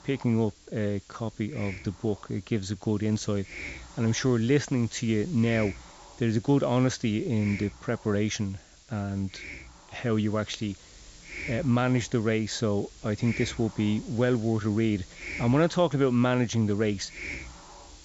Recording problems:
high frequencies cut off; noticeable; nothing above 8 kHz
hiss; noticeable; throughout; 15 dB below the speech

